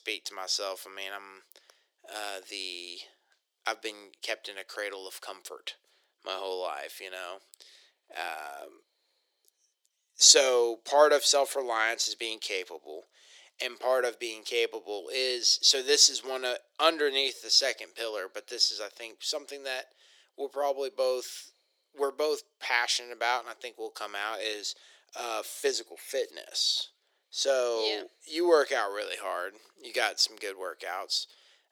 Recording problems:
thin; very; fading below 350 Hz

